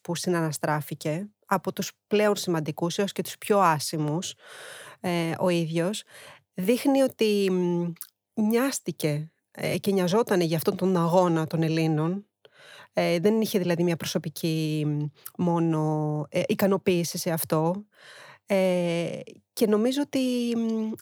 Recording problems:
none

